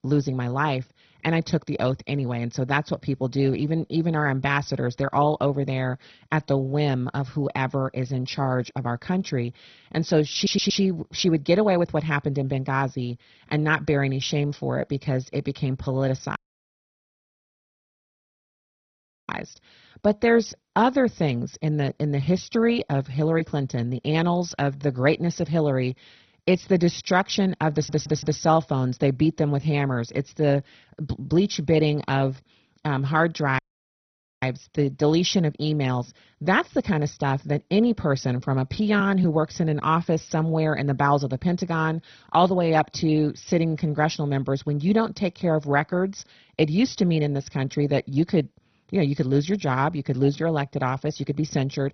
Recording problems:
garbled, watery; badly; nothing above 6 kHz
audio stuttering; at 10 s and at 28 s
audio cutting out; at 16 s for 3 s and at 34 s for 1 s

